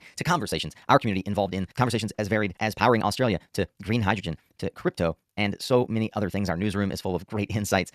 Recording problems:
wrong speed, natural pitch; too fast; 1.7 times normal speed

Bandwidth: 14.5 kHz